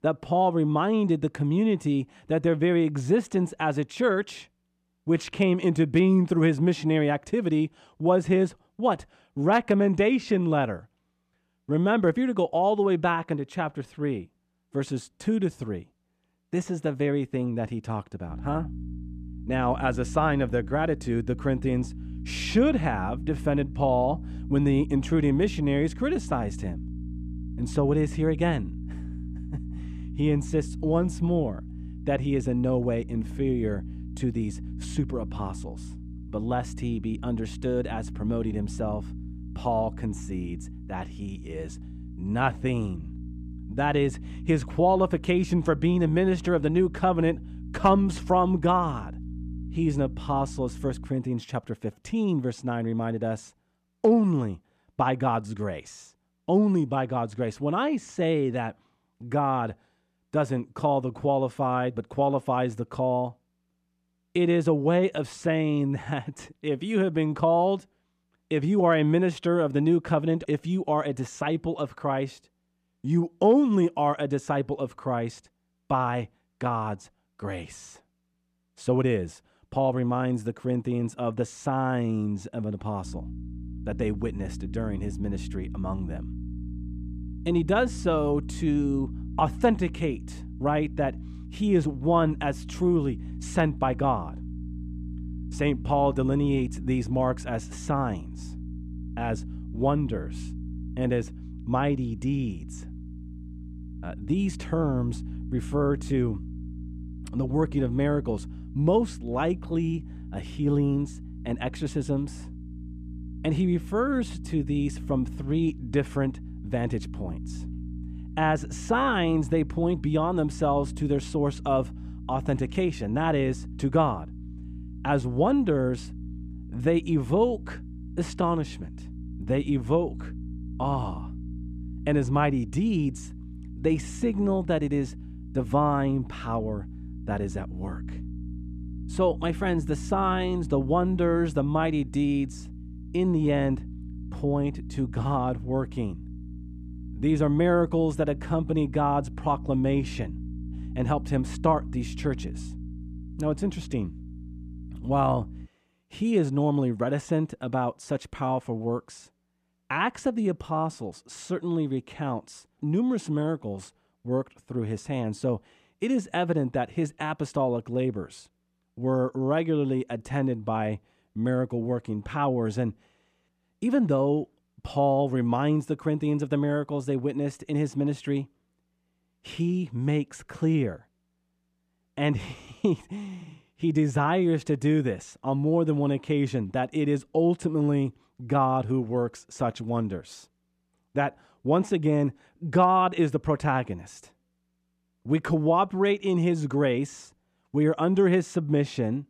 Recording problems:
electrical hum; noticeable; from 18 to 51 s and from 1:23 to 2:36; 60 Hz, 20 dB below the speech

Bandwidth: 14.5 kHz